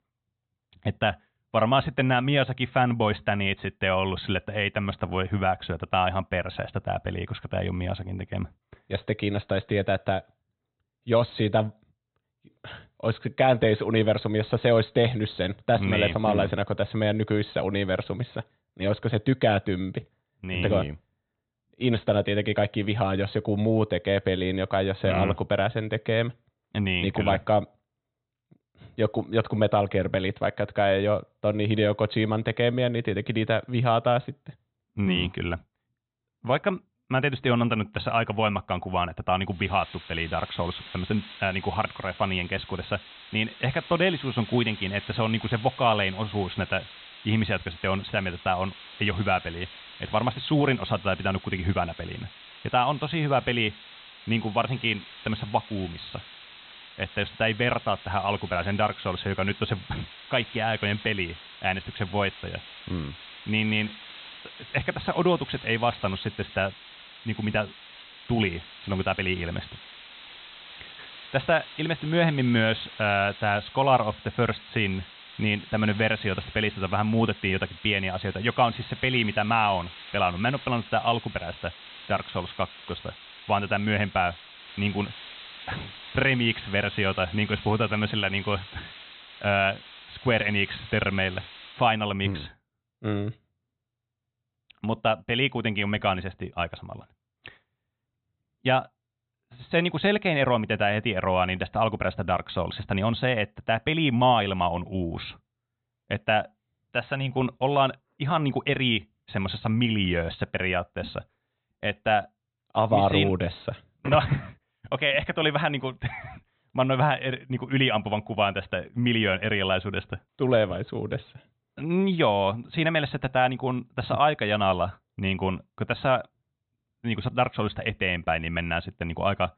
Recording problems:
high frequencies cut off; severe; nothing above 4 kHz
hiss; noticeable; from 40 s to 1:32; 15 dB below the speech

